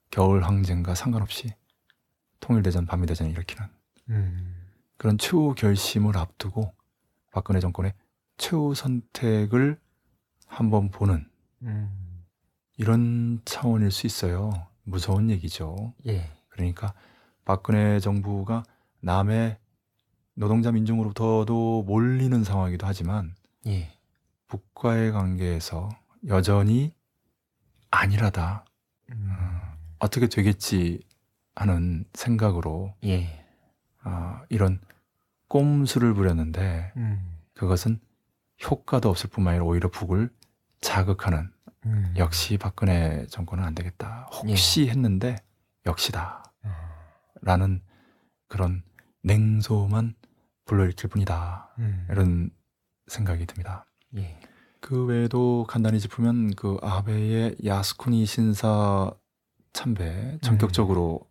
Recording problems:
uneven, jittery; strongly; from 1 to 55 s

